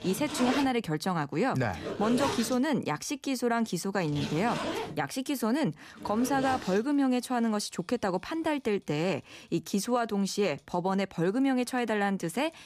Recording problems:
household noises; loud; throughout; 7 dB below the speech

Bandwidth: 14.5 kHz